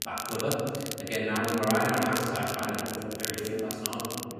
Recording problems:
room echo; strong; dies away in 2 s
off-mic speech; far
voice in the background; loud; throughout; 8 dB below the speech
crackle, like an old record; very faint; 5 dB below the speech

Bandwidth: 14.5 kHz